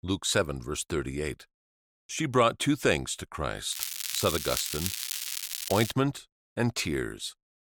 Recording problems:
crackling; loud; from 3.5 to 6 s; 3 dB below the speech

